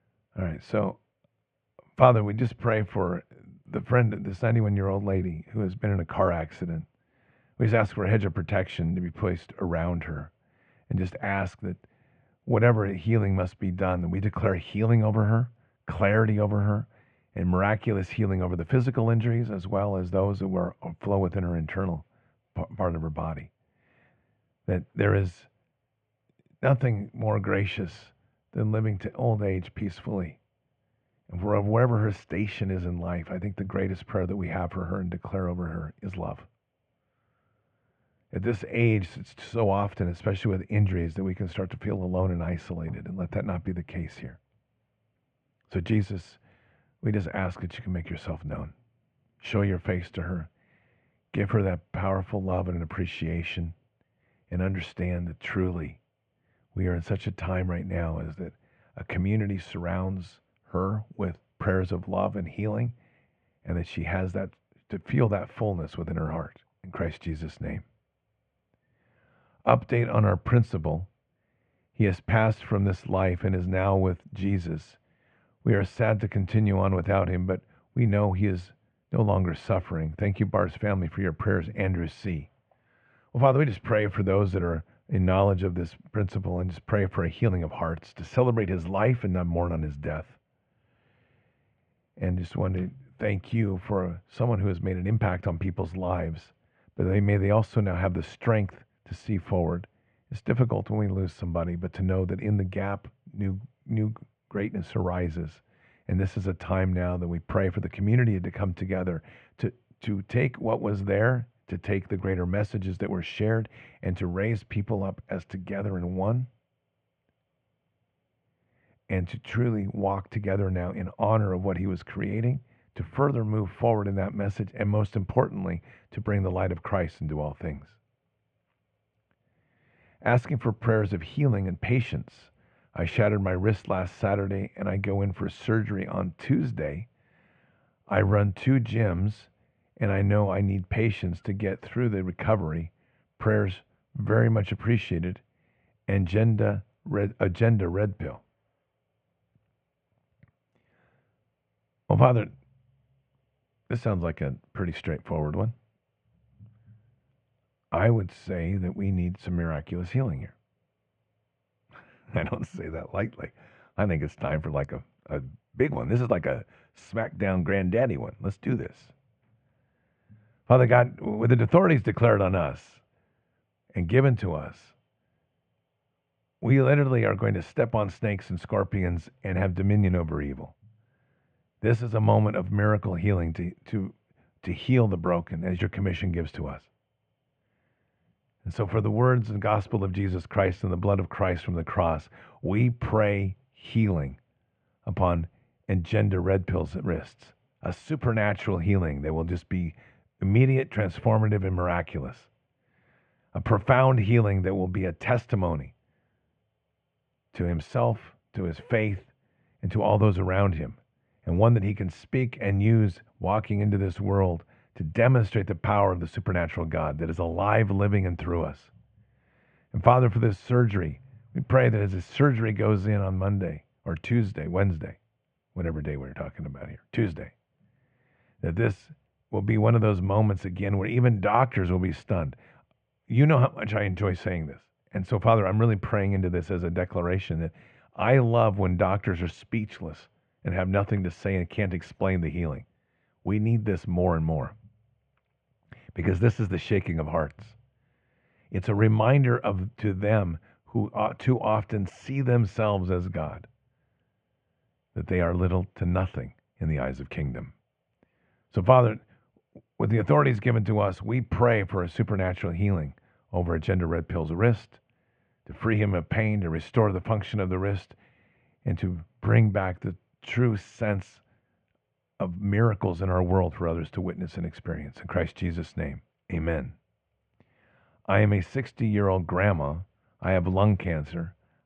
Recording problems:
muffled; very; fading above 2.5 kHz

